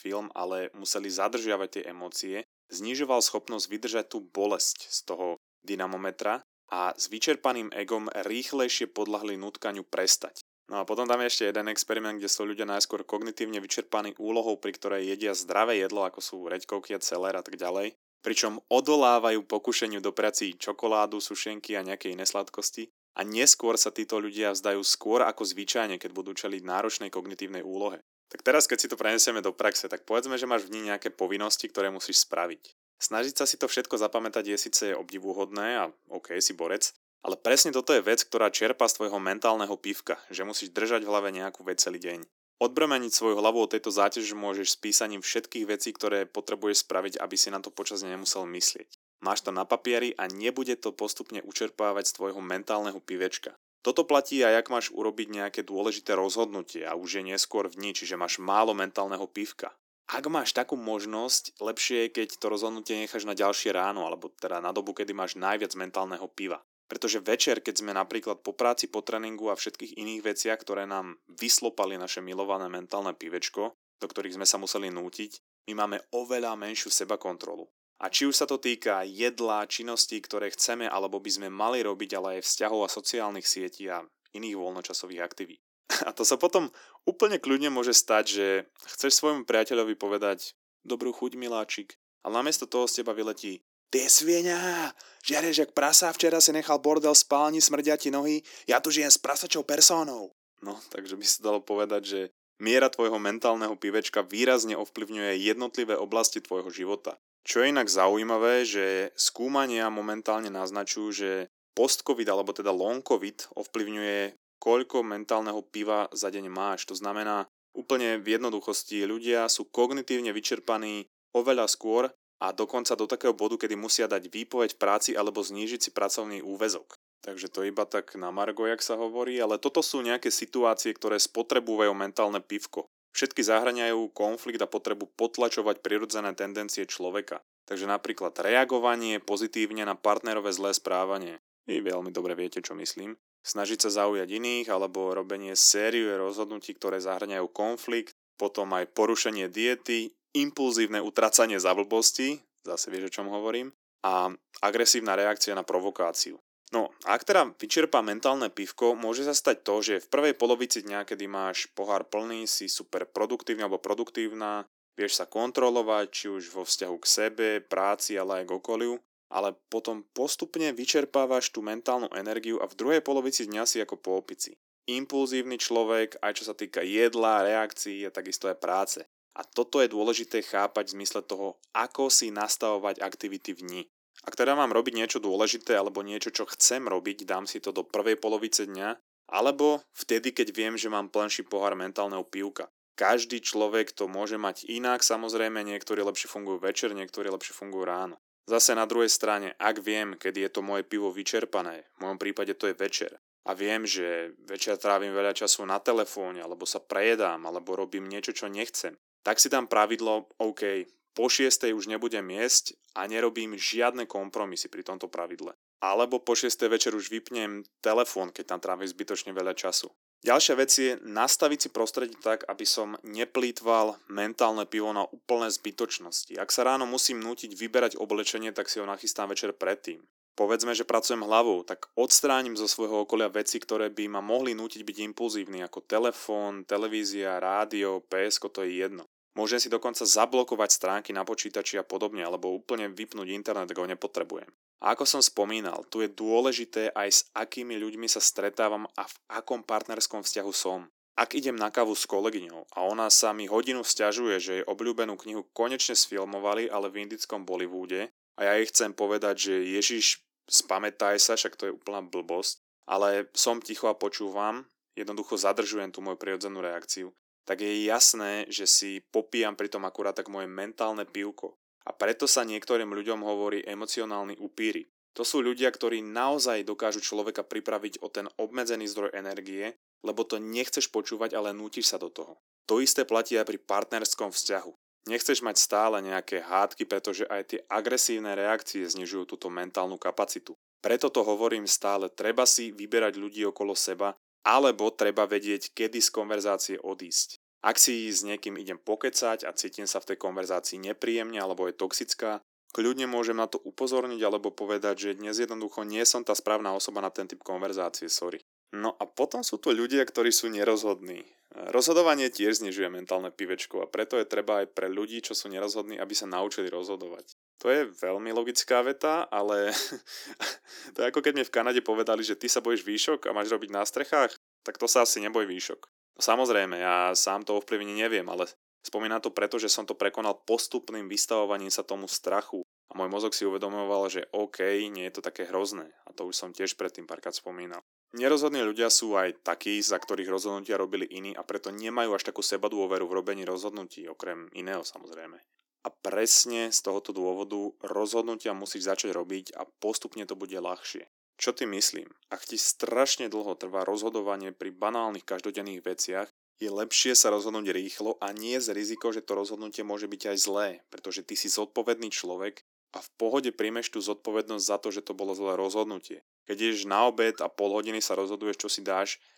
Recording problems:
thin; somewhat; fading below 300 Hz

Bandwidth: 18 kHz